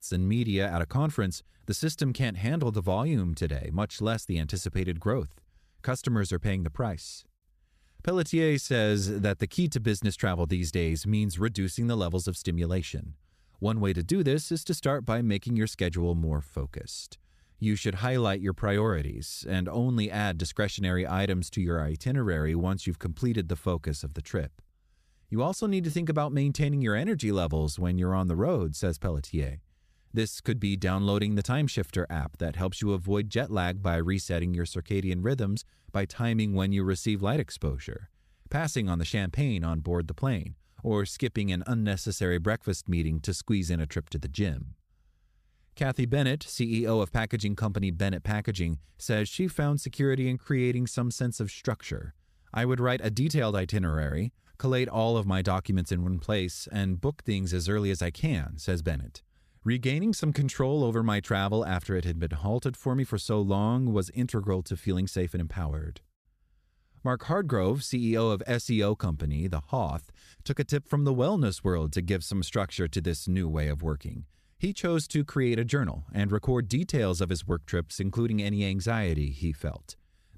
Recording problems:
none

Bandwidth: 14.5 kHz